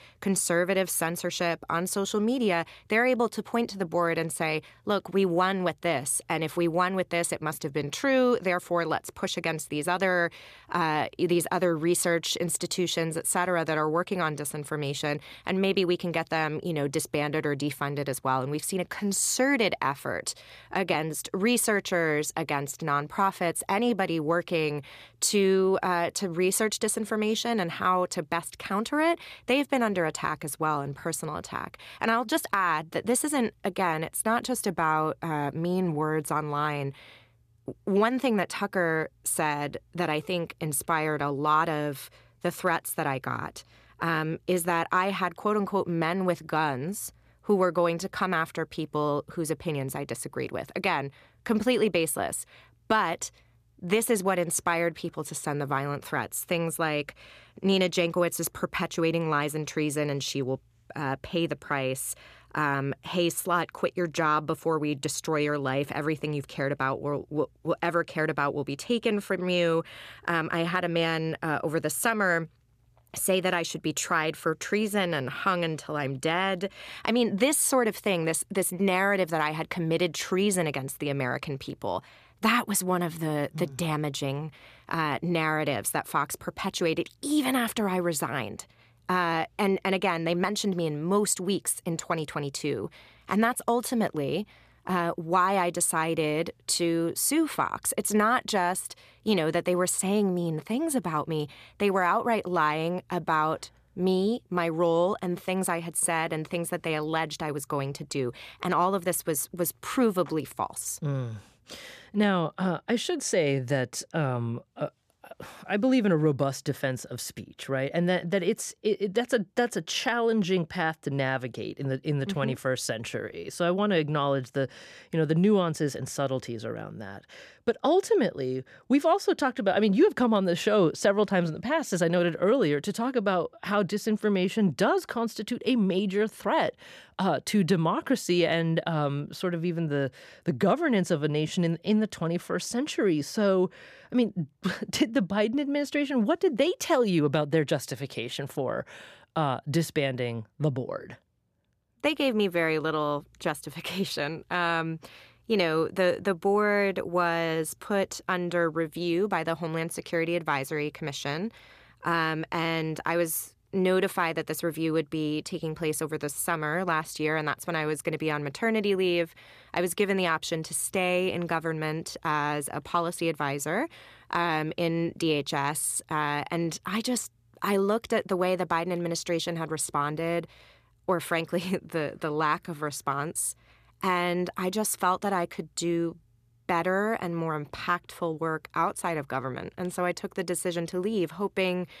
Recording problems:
none

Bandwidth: 14.5 kHz